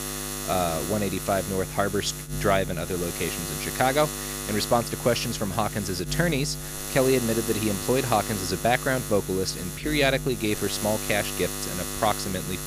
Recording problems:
electrical hum; loud; throughout; 50 Hz, 8 dB below the speech

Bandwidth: 15 kHz